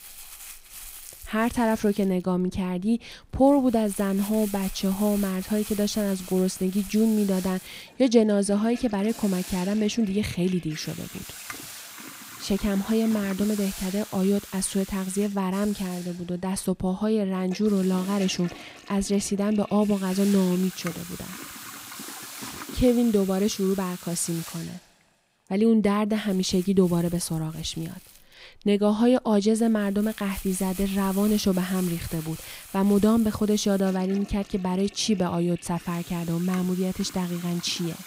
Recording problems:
household noises; noticeable; throughout; 15 dB below the speech
hiss; noticeable; from 7 to 26 s; 15 dB below the speech

